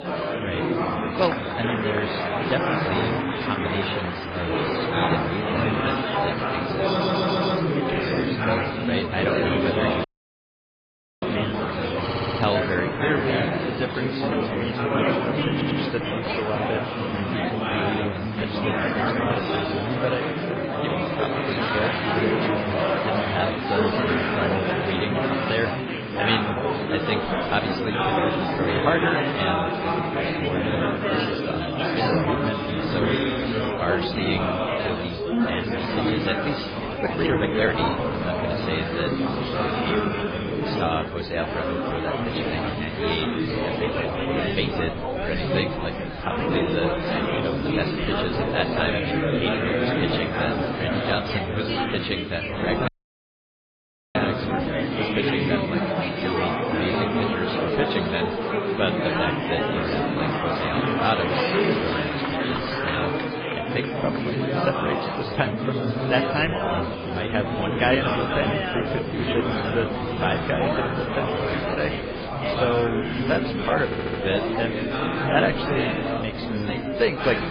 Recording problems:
garbled, watery; badly
chatter from many people; very loud; throughout; 4 dB above the speech
audio stuttering; 4 times, first at 7 s
audio cutting out; at 10 s for 1 s and at 53 s for 1.5 s
uneven, jittery; strongly; from 19 to 40 s

